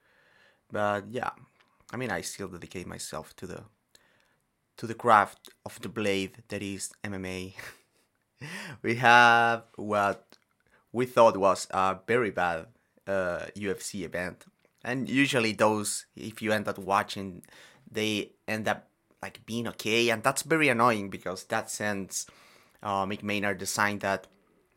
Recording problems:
none

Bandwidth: 16 kHz